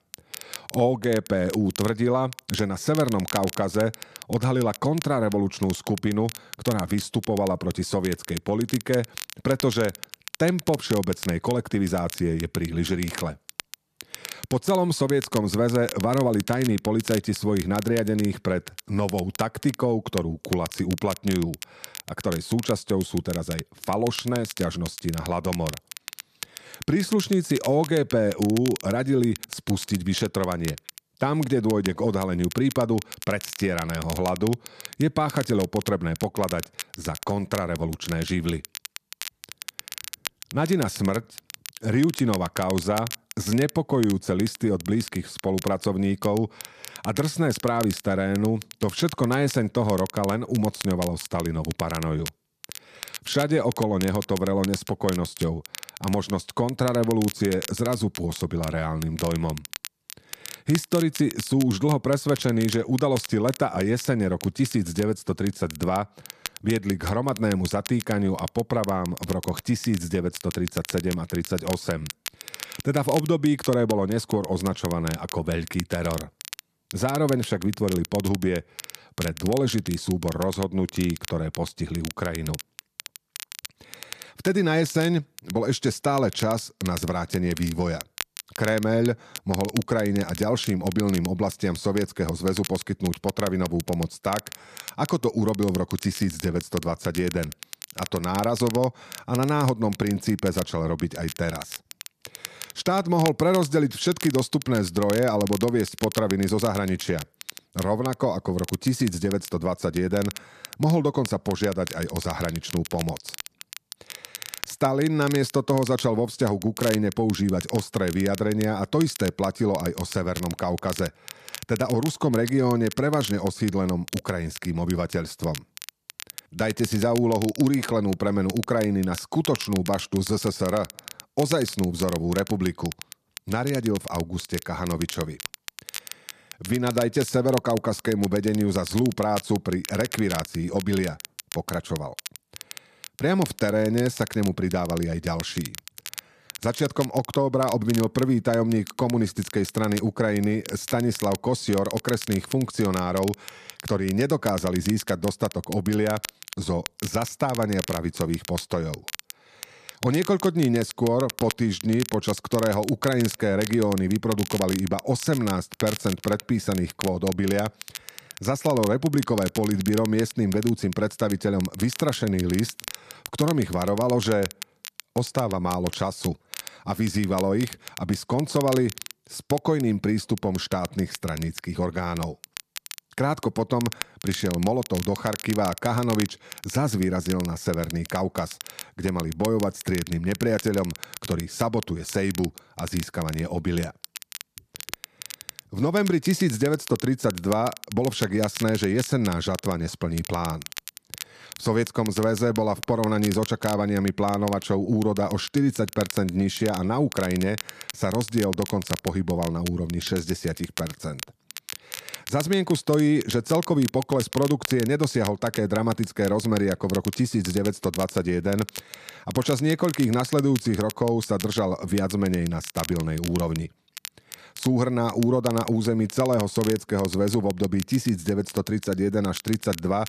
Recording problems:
crackle, like an old record; noticeable; 15 dB below the speech

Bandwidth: 14.5 kHz